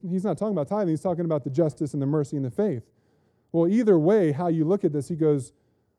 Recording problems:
muffled; very; fading above 1 kHz

